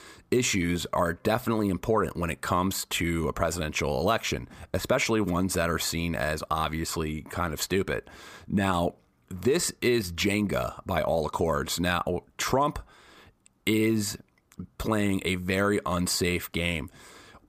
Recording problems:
none

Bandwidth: 15 kHz